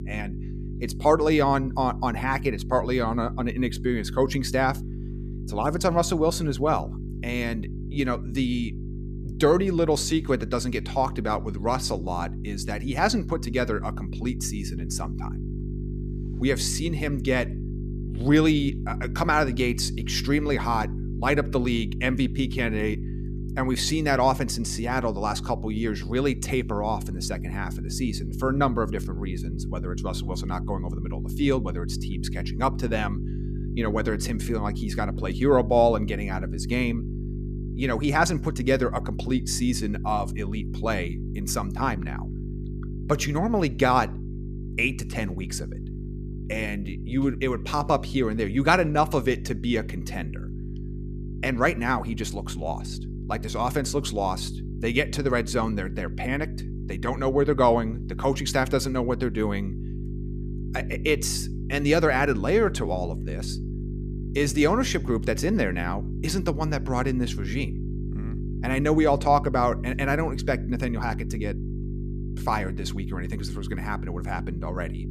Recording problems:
electrical hum; noticeable; throughout; 50 Hz, 15 dB below the speech

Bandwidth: 14.5 kHz